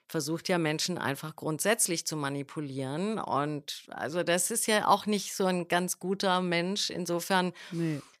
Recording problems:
none

